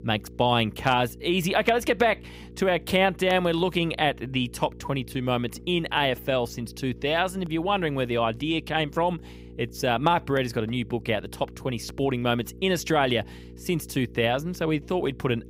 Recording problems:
electrical hum; faint; throughout; 60 Hz, 25 dB below the speech

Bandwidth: 15.5 kHz